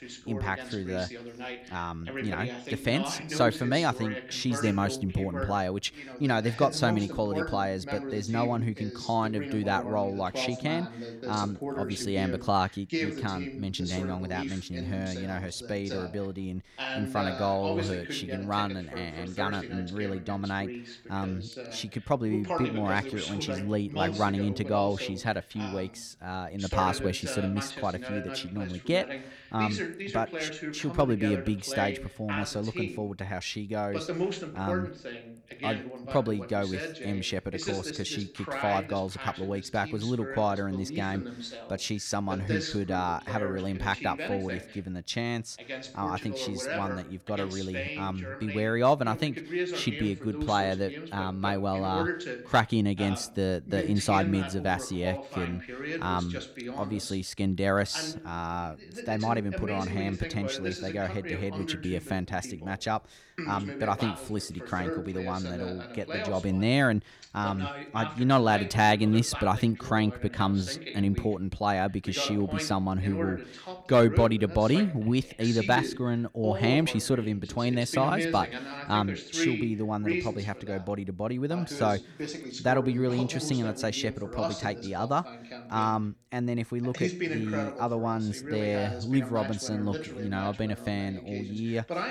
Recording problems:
voice in the background; loud; throughout; 7 dB below the speech

